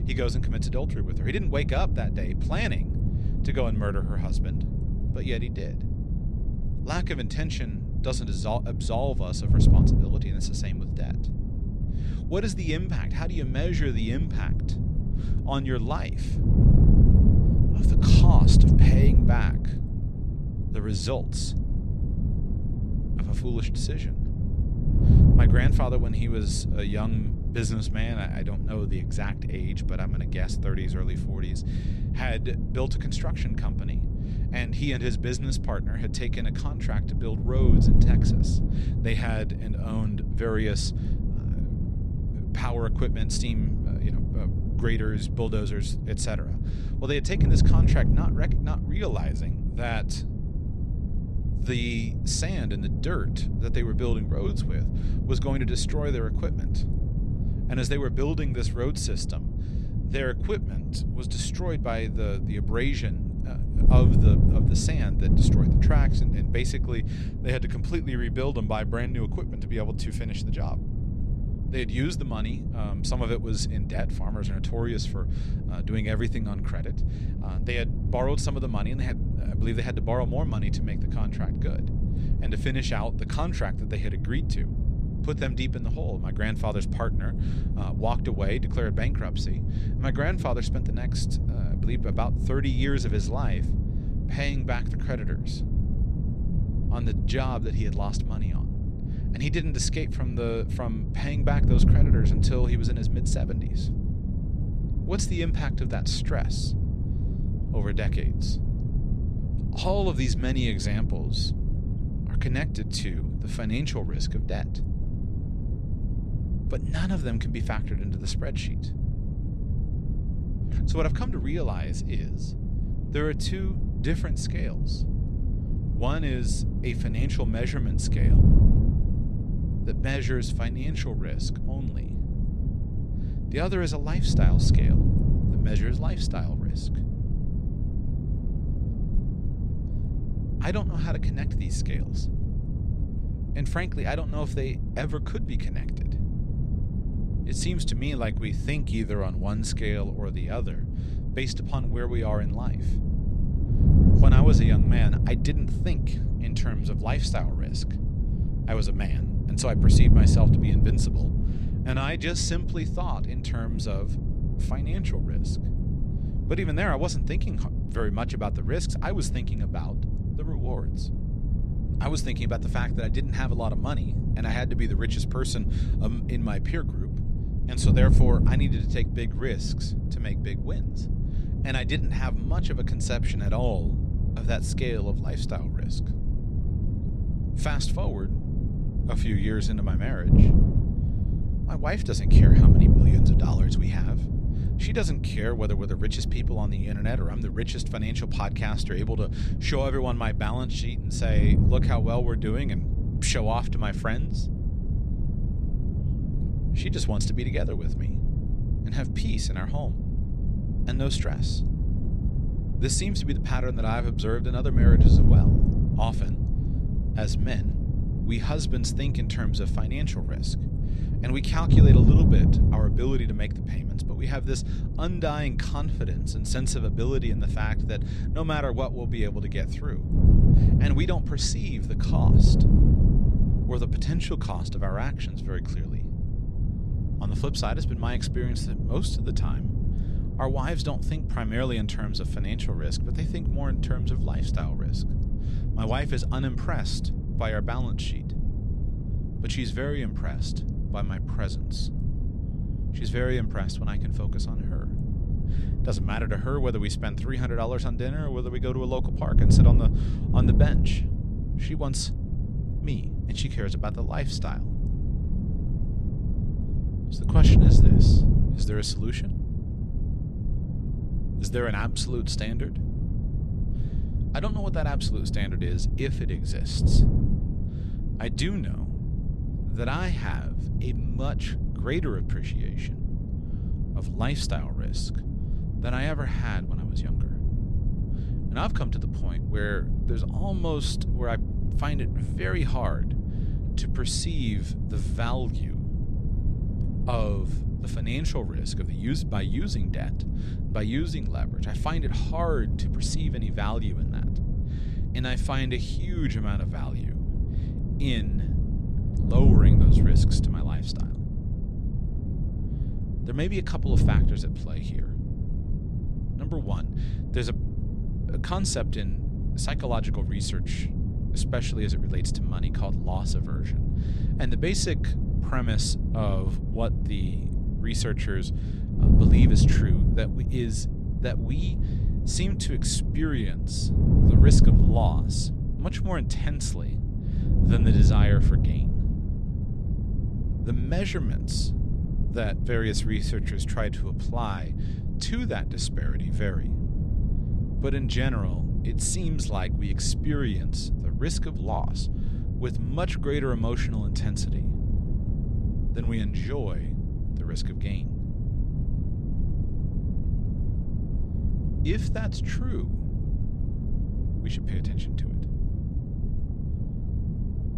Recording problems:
wind noise on the microphone; heavy; 5 dB below the speech

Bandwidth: 13.5 kHz